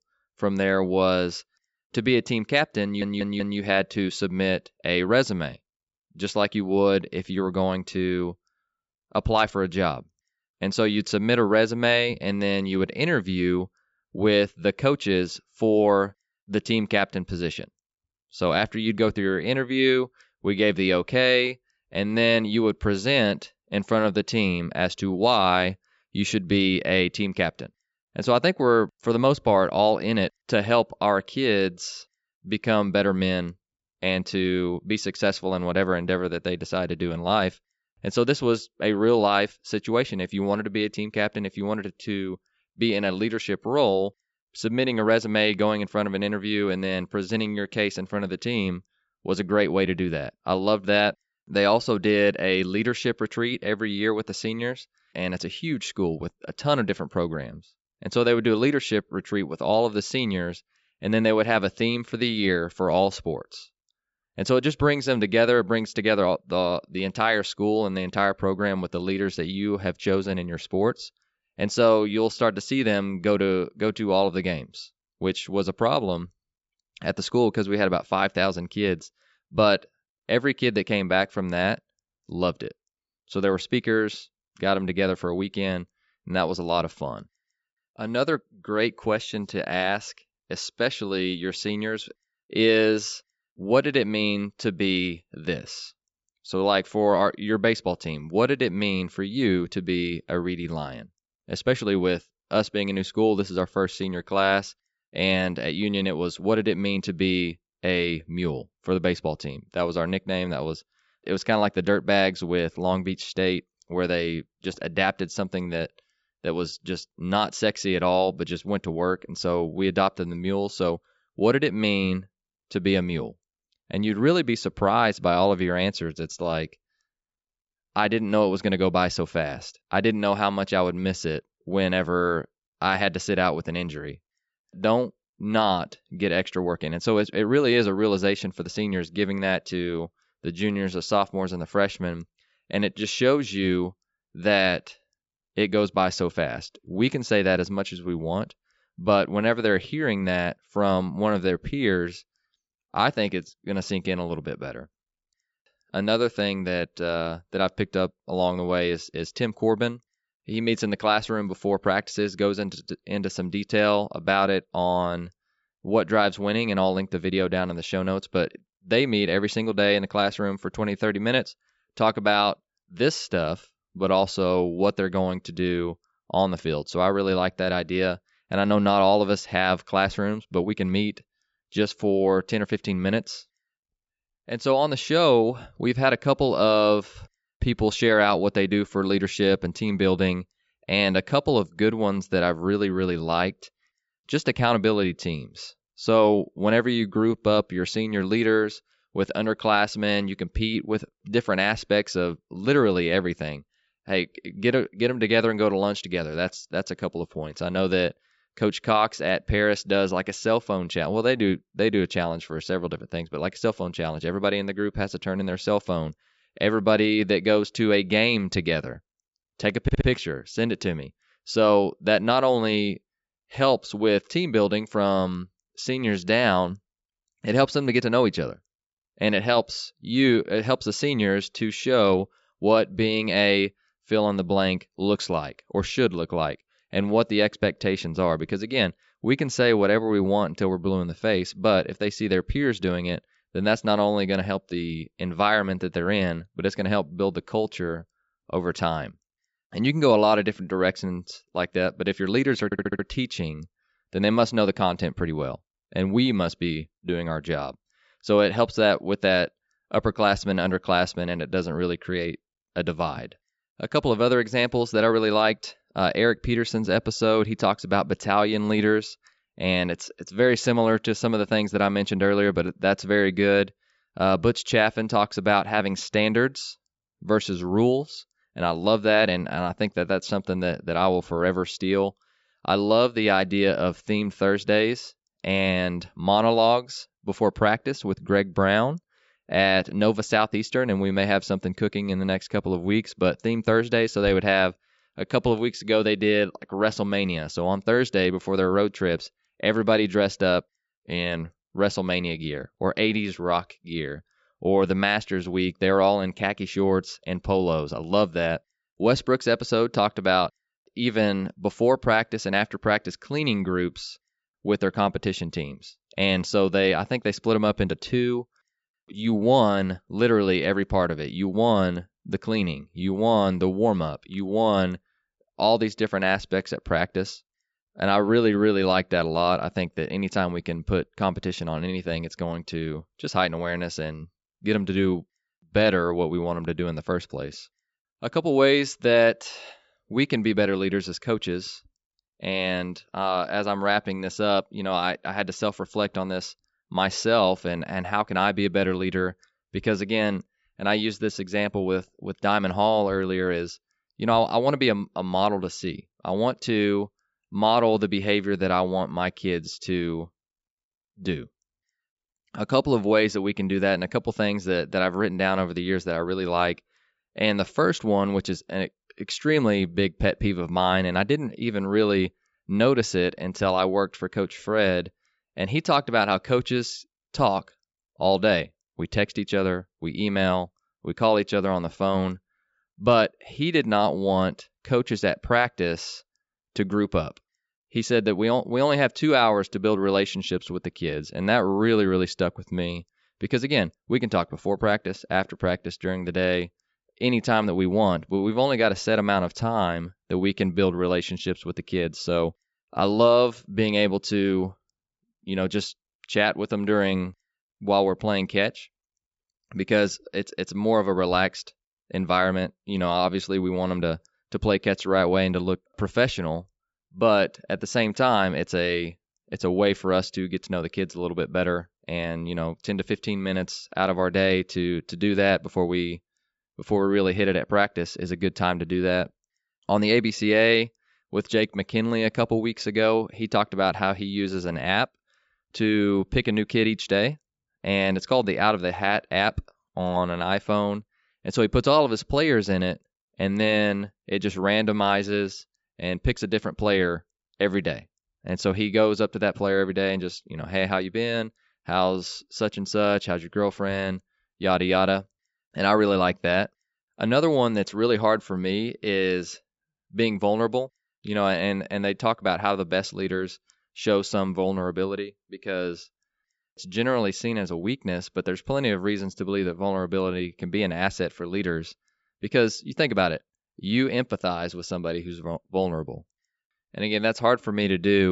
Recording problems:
high frequencies cut off; noticeable; nothing above 8 kHz
audio stuttering; at 3 s, at 3:40 and at 4:13
abrupt cut into speech; at the end

